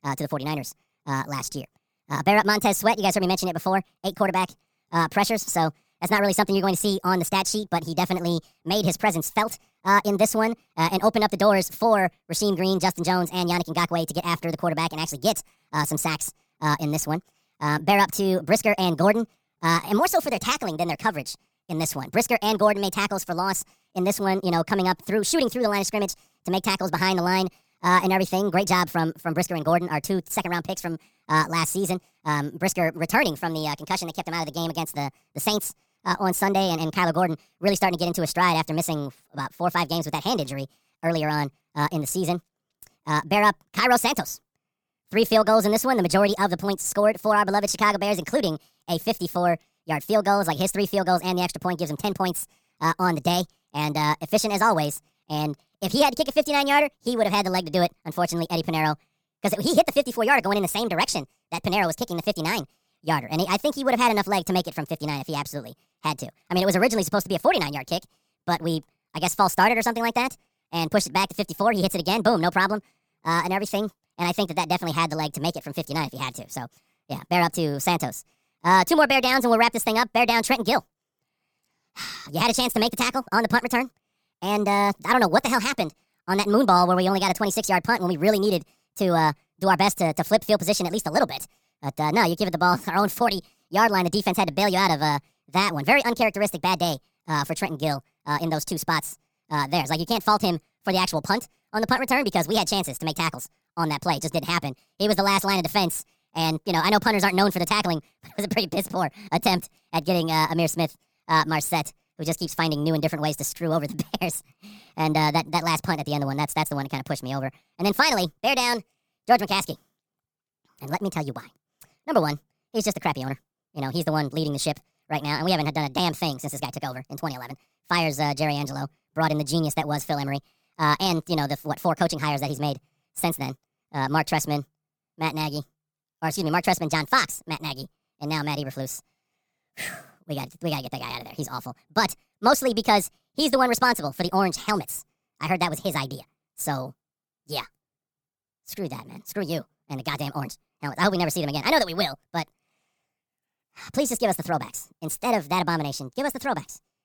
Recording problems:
wrong speed and pitch; too fast and too high; 1.5 times normal speed

